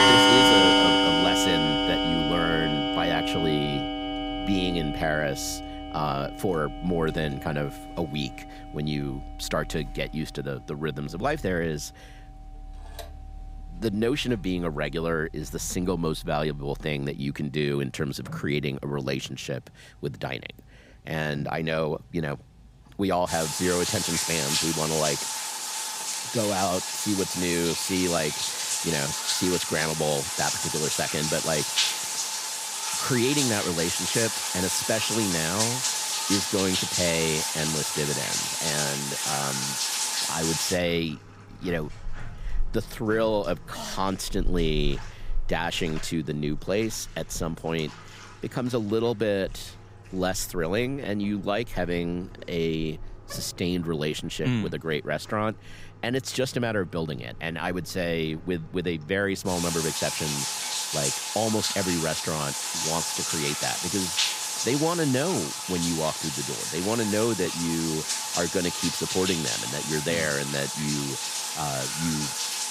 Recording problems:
household noises; very loud; throughout; 3 dB above the speech

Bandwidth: 15.5 kHz